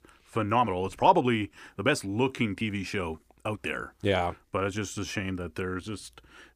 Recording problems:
uneven, jittery; strongly; from 0.5 to 6 s

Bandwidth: 15 kHz